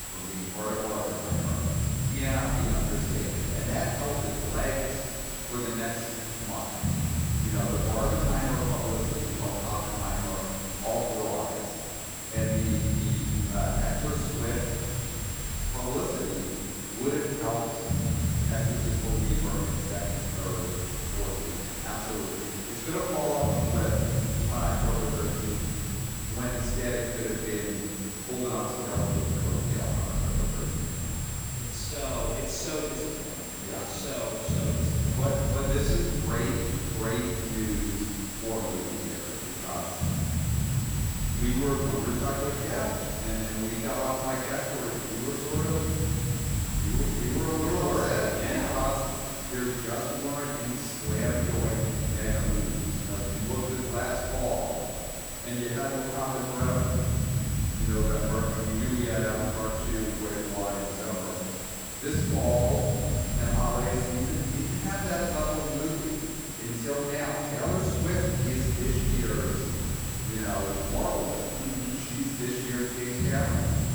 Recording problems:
room echo; strong; dies away in 2.2 s
off-mic speech; far
high-pitched whine; loud; throughout; 7.5 kHz, 6 dB below the speech
hiss; loud; throughout; 4 dB below the speech
low rumble; loud; throughout; 10 dB below the speech
crackling; very faint; 4 times, first at 2.5 s; 25 dB below the speech

